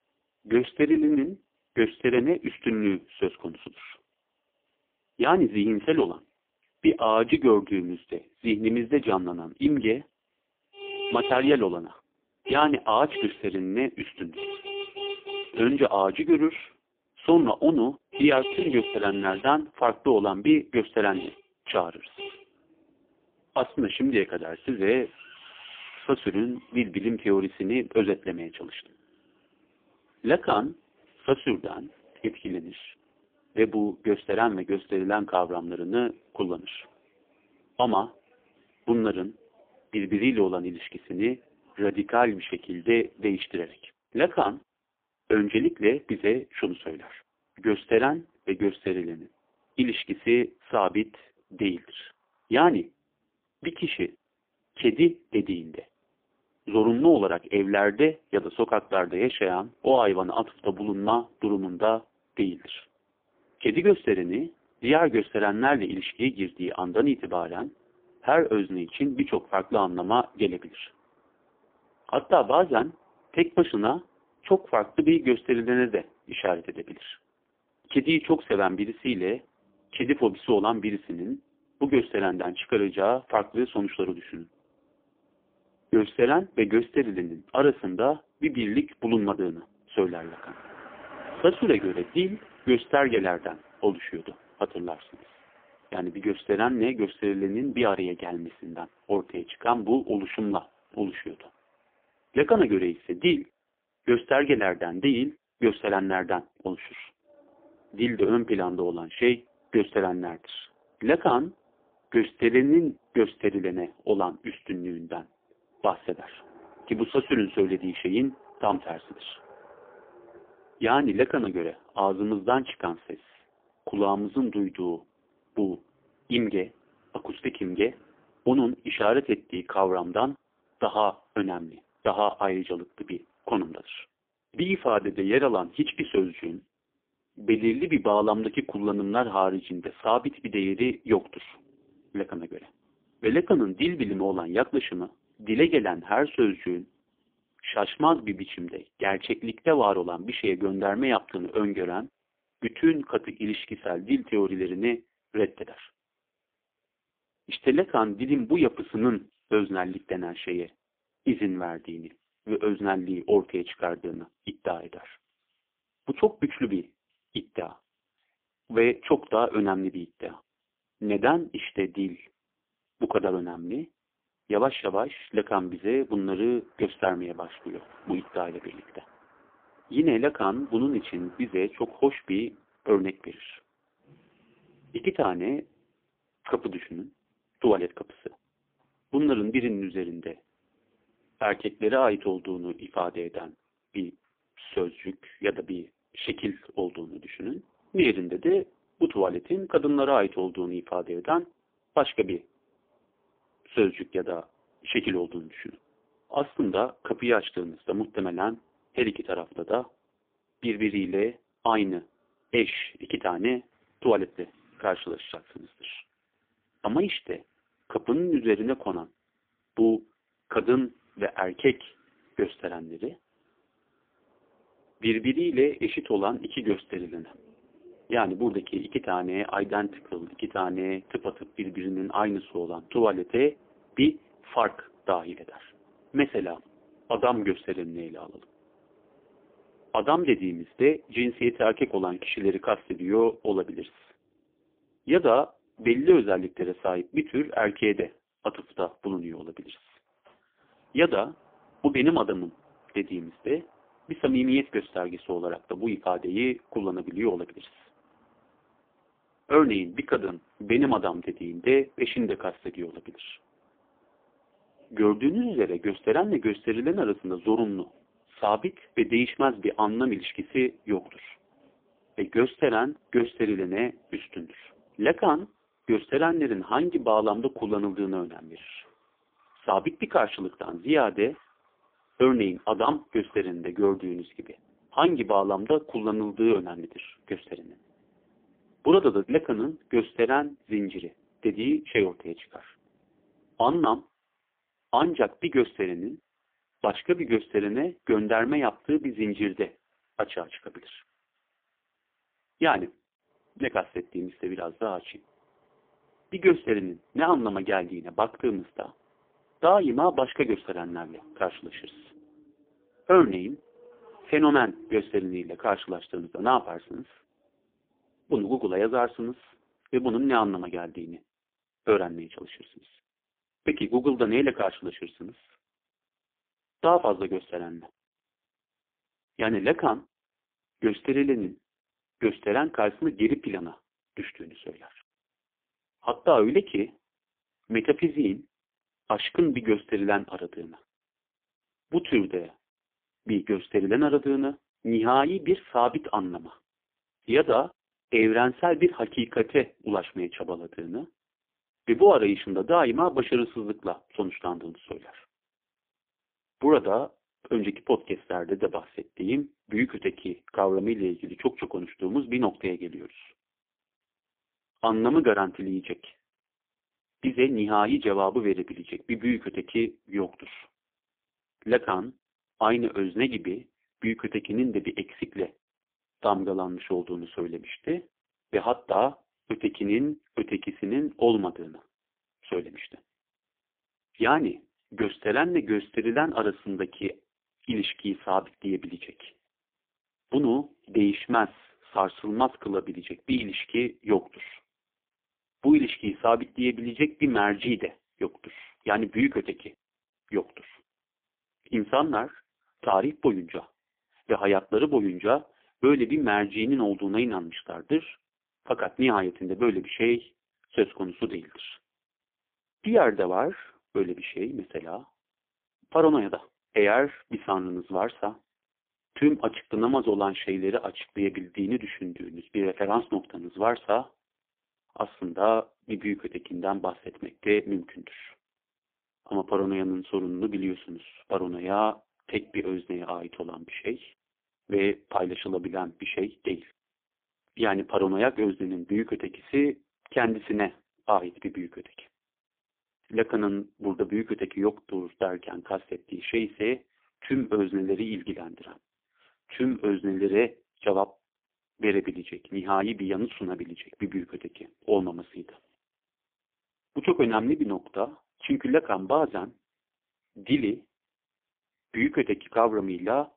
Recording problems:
phone-call audio; poor line; nothing above 3.5 kHz
traffic noise; noticeable; until 5:20; 15 dB below the speech

